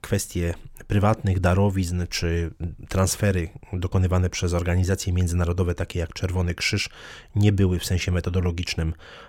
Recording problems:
none

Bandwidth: 16.5 kHz